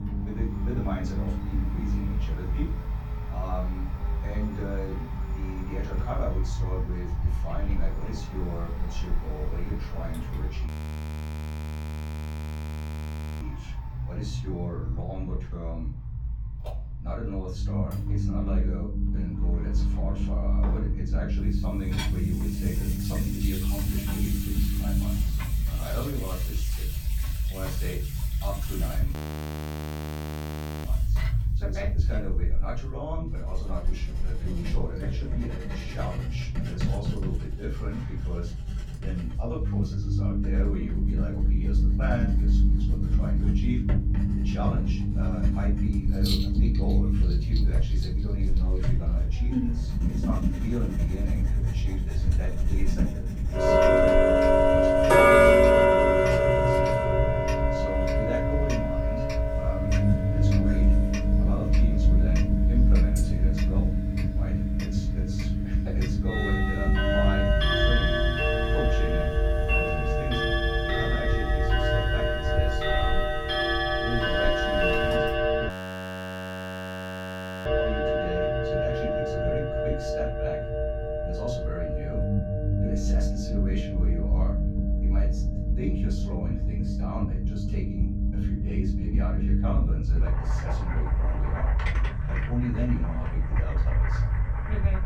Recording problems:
off-mic speech; far
room echo; slight; dies away in 0.3 s
household noises; very loud; throughout; 10 dB above the speech
low rumble; loud; throughout; 2 dB below the speech
audio freezing; at 11 s for 2.5 s, at 29 s for 1.5 s and at 1:16 for 2 s

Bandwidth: 18 kHz